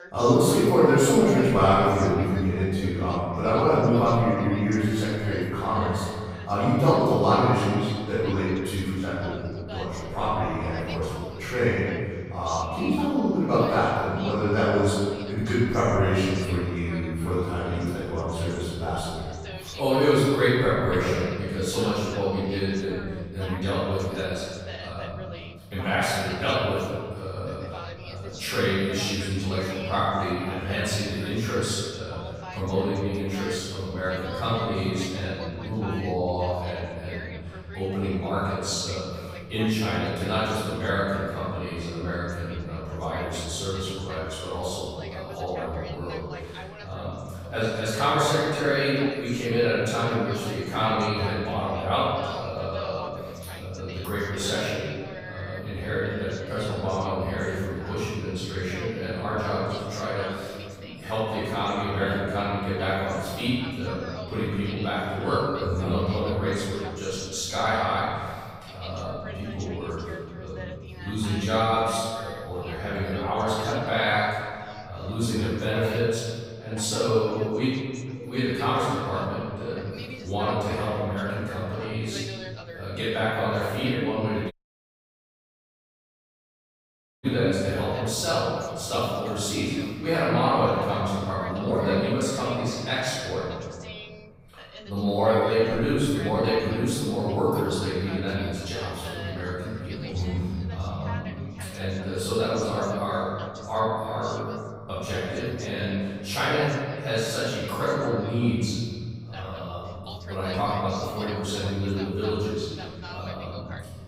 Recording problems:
room echo; strong; dies away in 1.9 s
off-mic speech; far
voice in the background; noticeable; throughout; 15 dB below the speech
audio cutting out; at 1:25 for 2.5 s

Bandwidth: 15.5 kHz